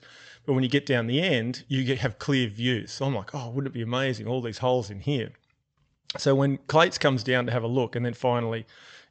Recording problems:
high frequencies cut off; noticeable; nothing above 8 kHz

